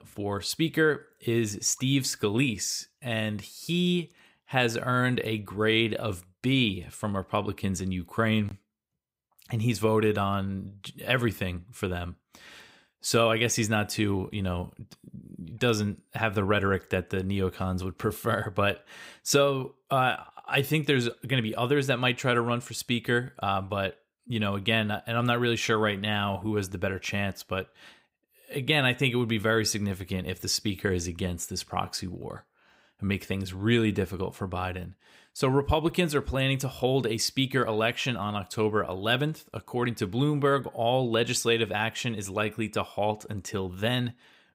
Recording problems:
none

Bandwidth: 15.5 kHz